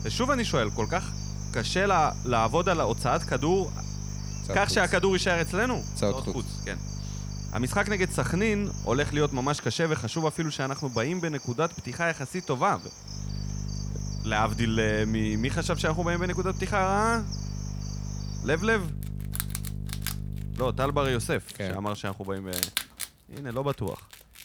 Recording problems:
animal sounds; noticeable; throughout; 15 dB below the speech
electrical hum; faint; until 9.5 s and from 13 to 21 s; 50 Hz, 20 dB below the speech

